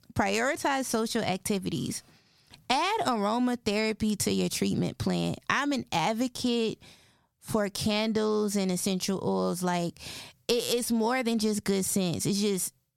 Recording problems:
squashed, flat; somewhat

